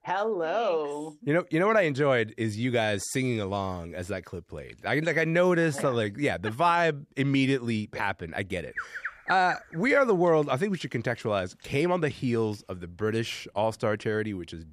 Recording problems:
animal sounds; noticeable; from 8.5 s on; 10 dB below the speech

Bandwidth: 14.5 kHz